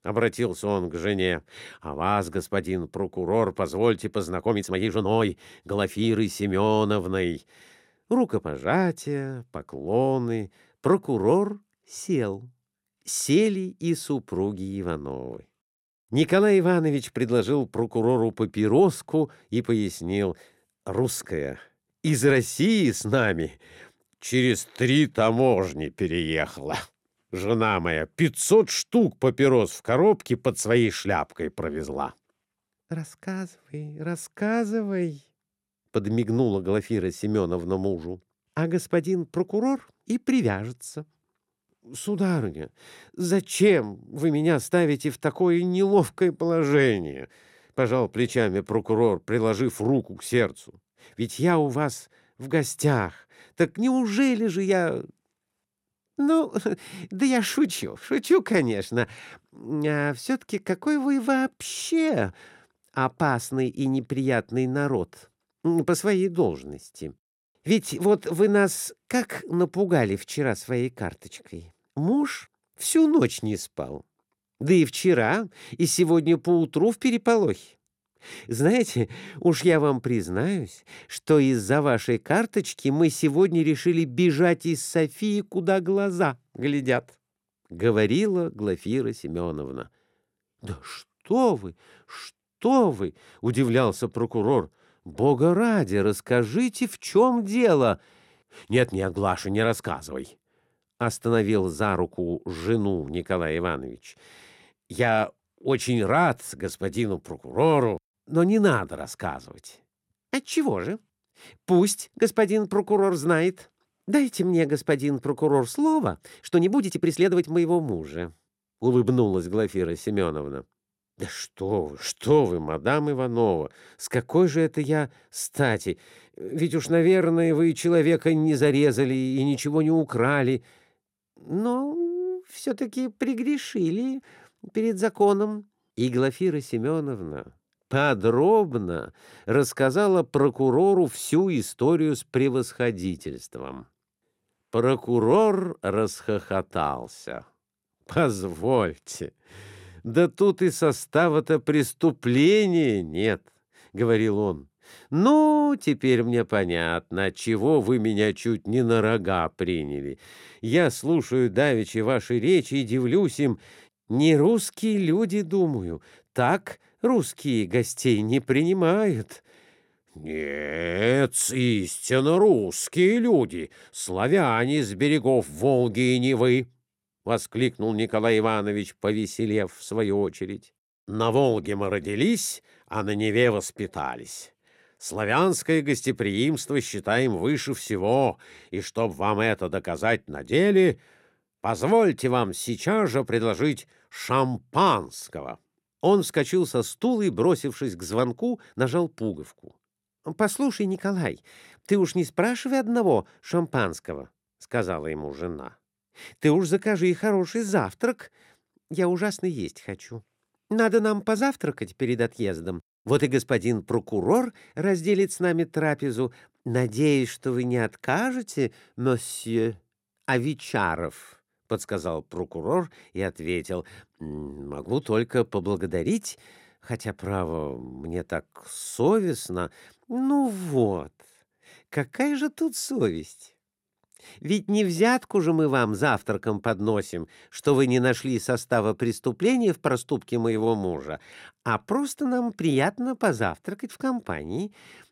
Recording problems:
uneven, jittery; strongly; from 4.5 s to 3:49

